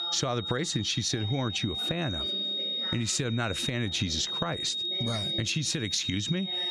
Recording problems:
squashed, flat; somewhat, background pumping
high-pitched whine; loud; throughout; 3.5 kHz, 2 dB below the speech
voice in the background; noticeable; throughout; 15 dB below the speech

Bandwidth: 14.5 kHz